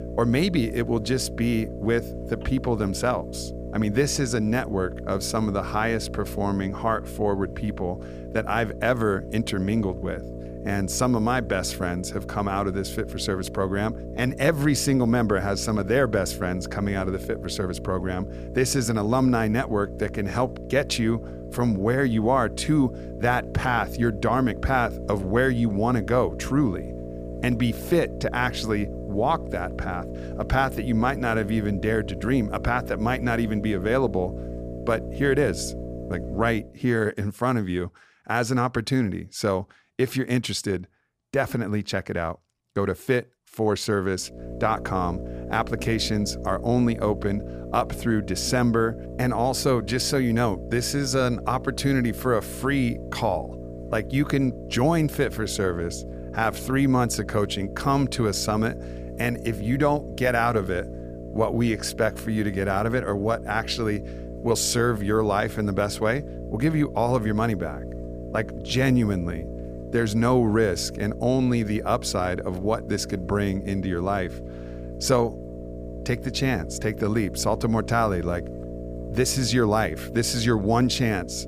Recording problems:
electrical hum; noticeable; until 37 s and from 44 s on; 60 Hz, 15 dB below the speech

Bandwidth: 15 kHz